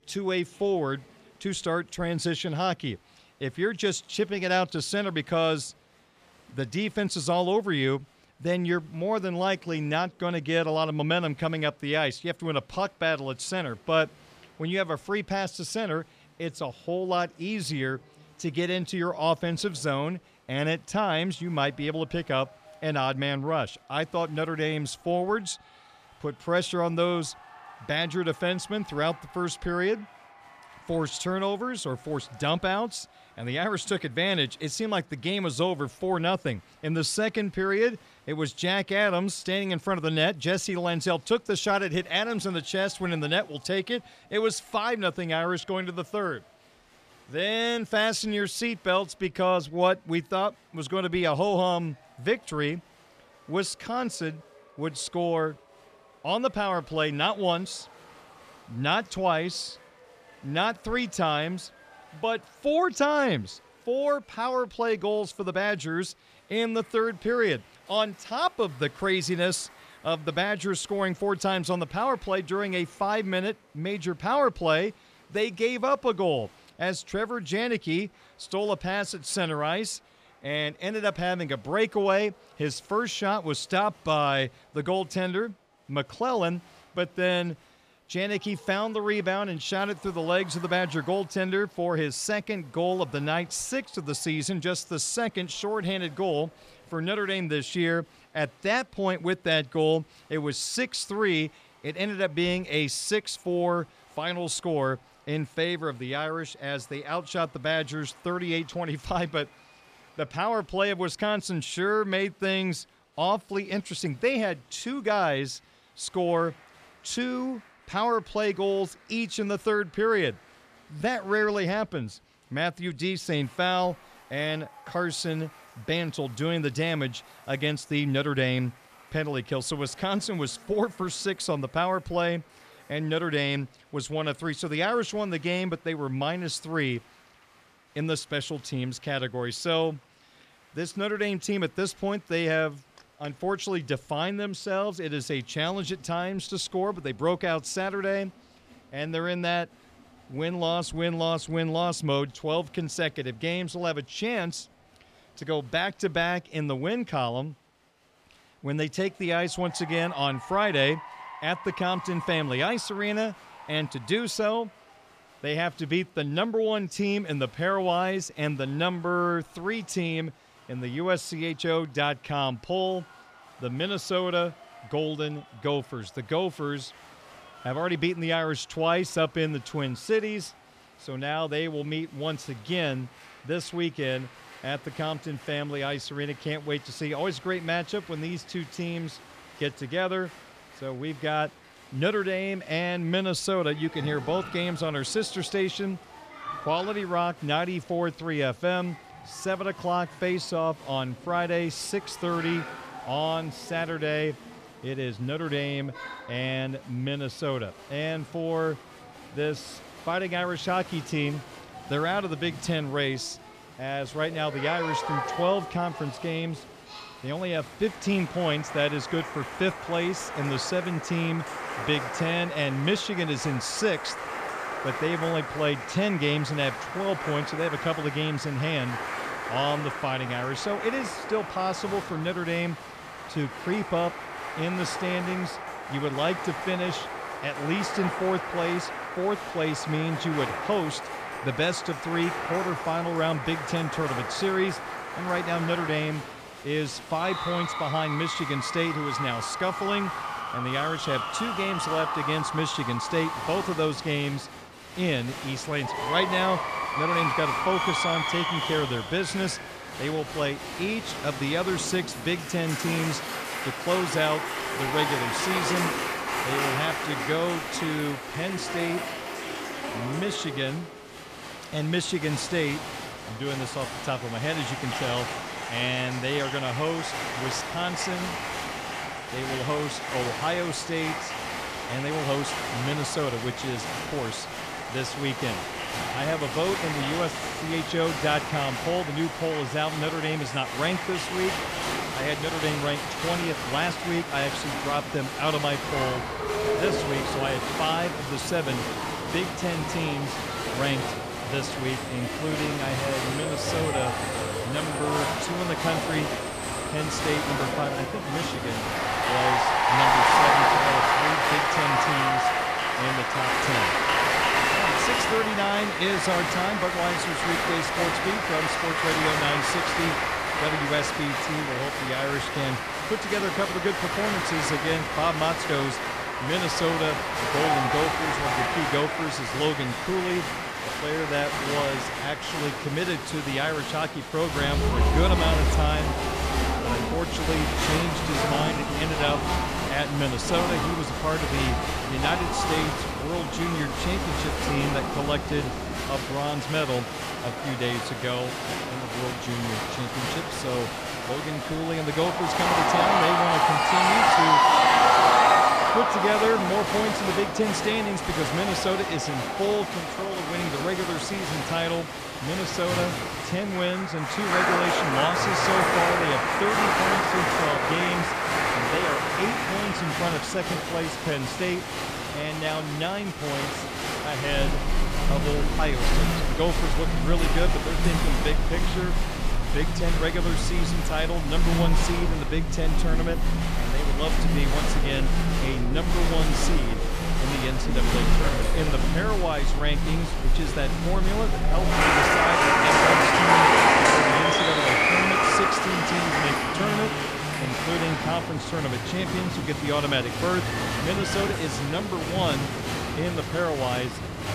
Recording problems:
crowd noise; very loud; throughout; 2 dB above the speech

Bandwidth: 14.5 kHz